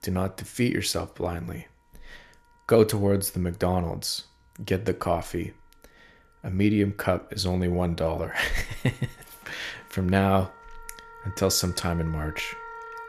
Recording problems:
background music; noticeable; throughout; 20 dB below the speech

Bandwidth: 14 kHz